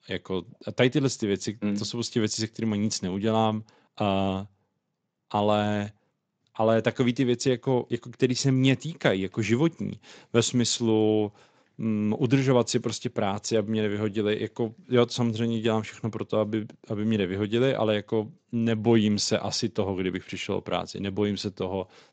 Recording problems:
garbled, watery; slightly; nothing above 7.5 kHz

